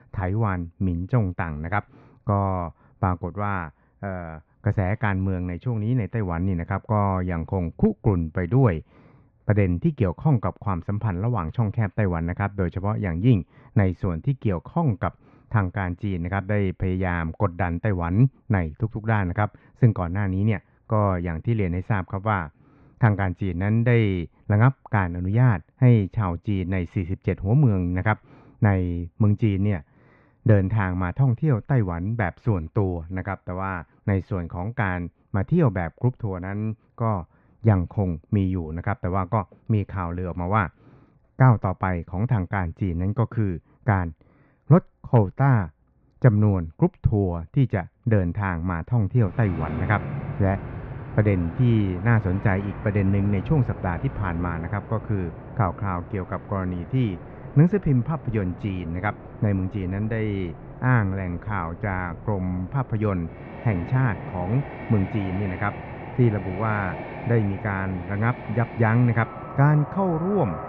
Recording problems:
muffled; very; fading above 2.5 kHz
train or aircraft noise; noticeable; from 49 s on; 10 dB below the speech

